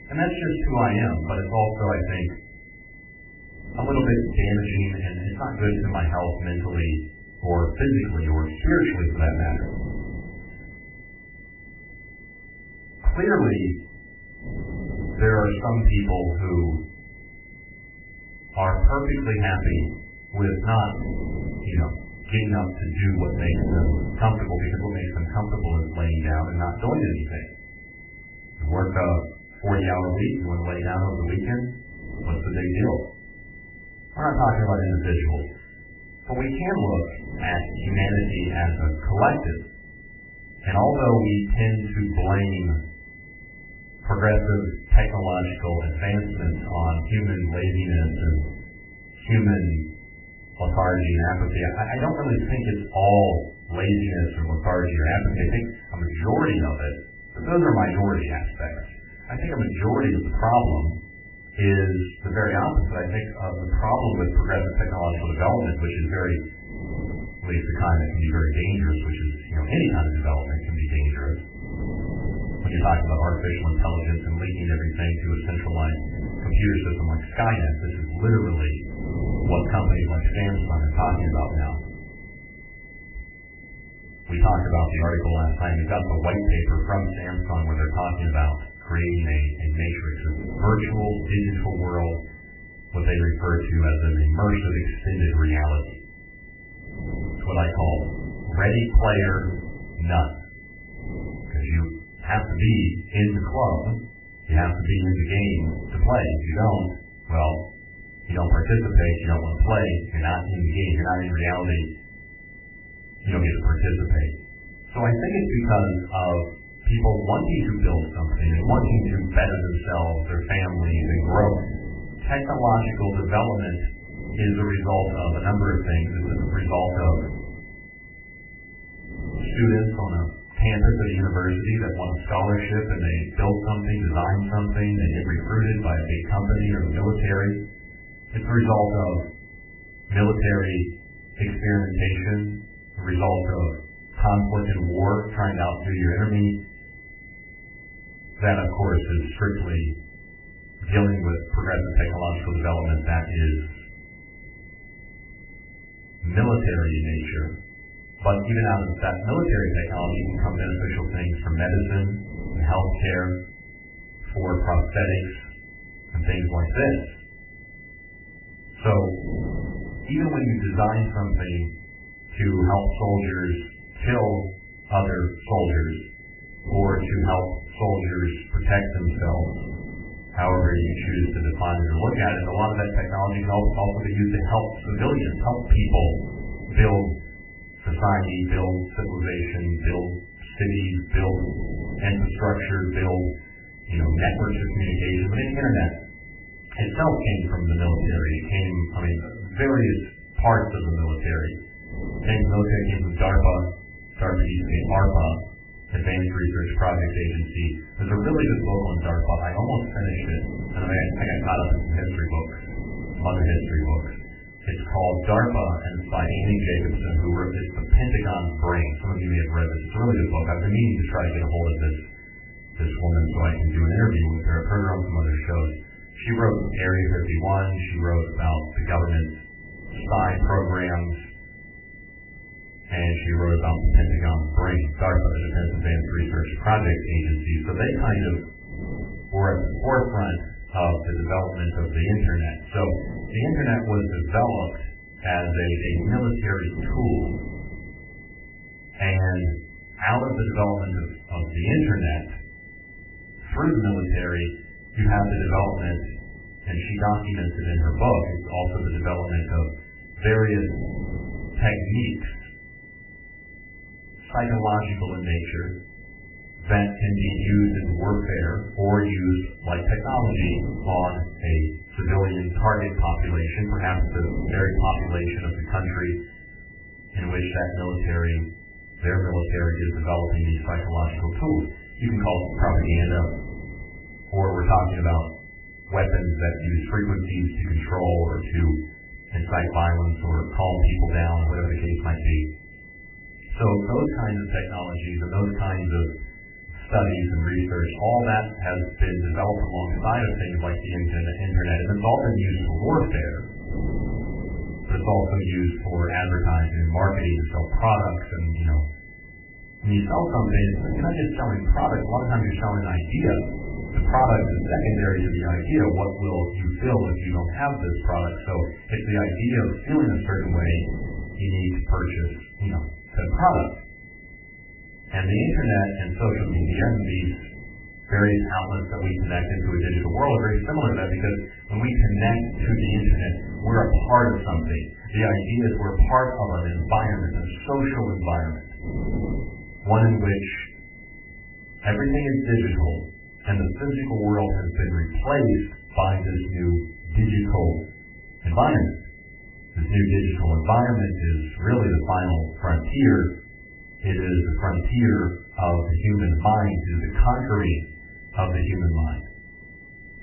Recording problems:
off-mic speech; far
garbled, watery; badly; nothing above 3 kHz
room echo; slight; dies away in 0.4 s
high-pitched whine; noticeable; throughout; 2 kHz, 20 dB below the speech
wind noise on the microphone; occasional gusts; 15 dB below the speech

